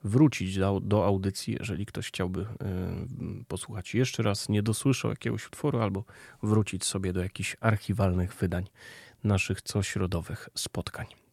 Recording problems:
none

